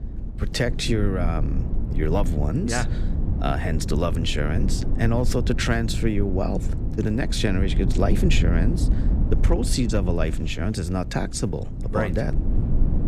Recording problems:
low rumble; noticeable; throughout; 10 dB below the speech

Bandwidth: 15 kHz